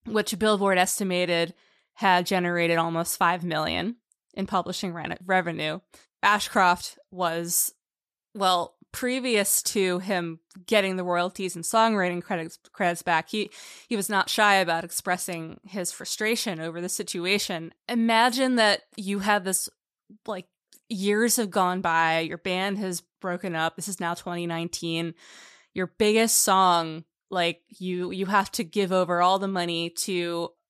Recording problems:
none

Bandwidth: 14.5 kHz